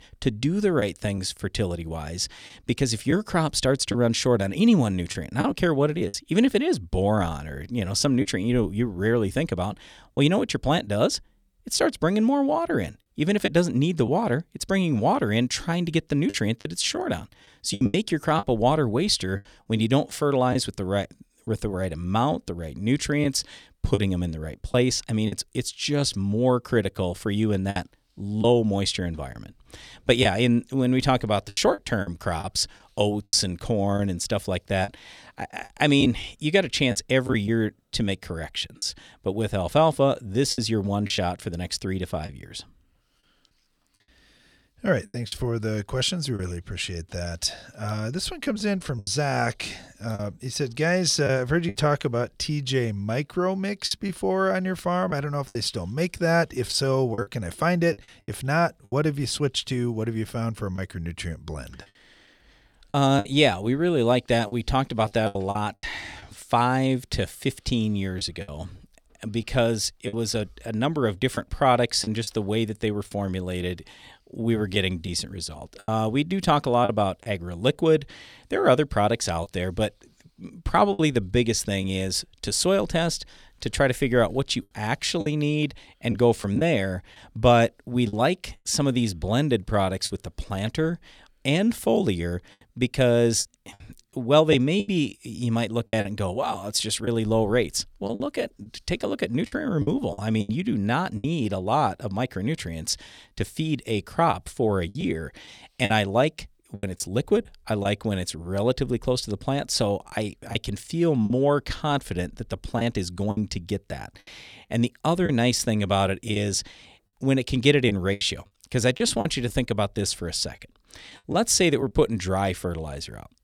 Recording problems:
choppy; occasionally; 5% of the speech affected

